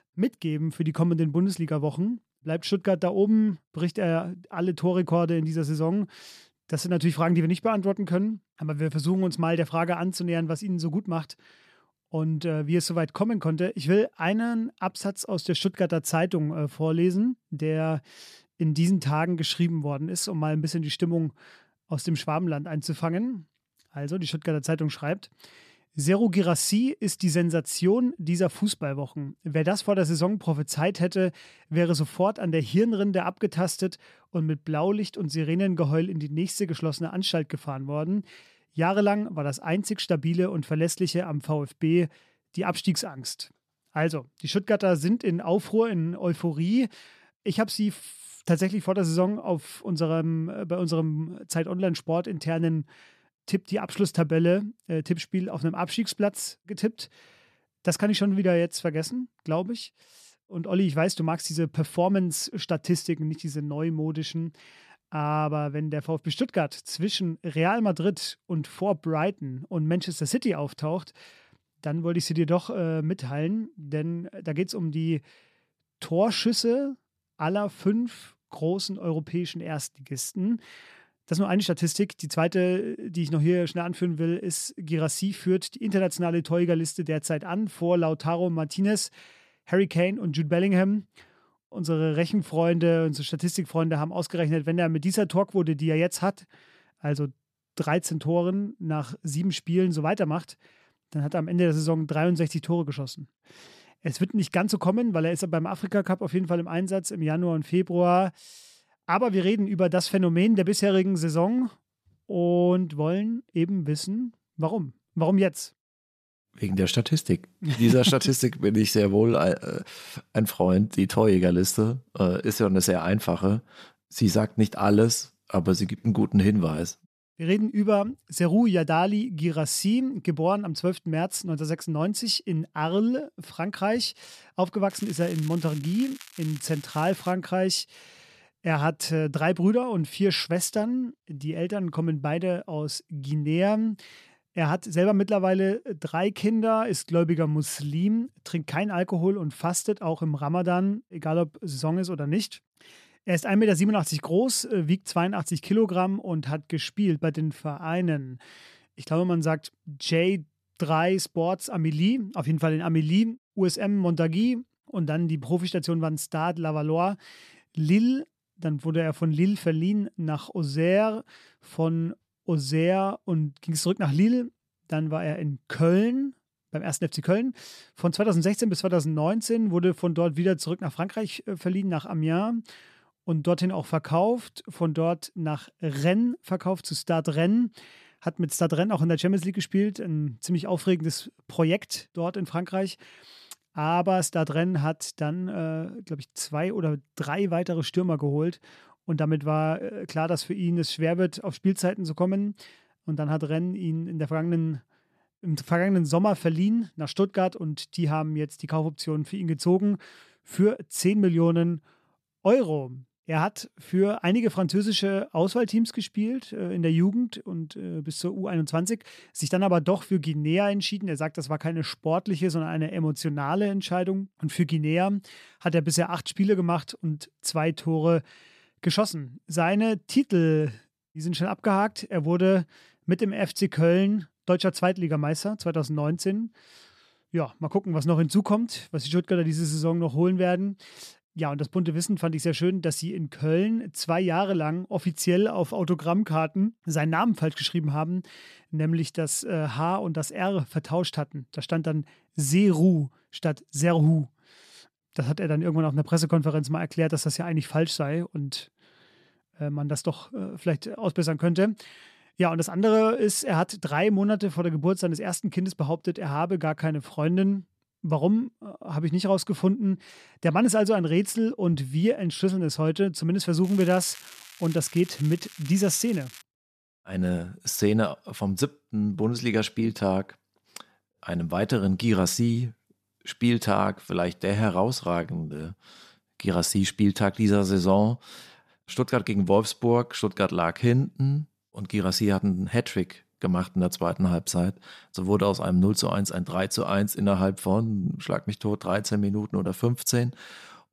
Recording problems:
crackling; noticeable; from 2:15 to 2:17 and from 4:34 to 4:36; 20 dB below the speech

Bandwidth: 14 kHz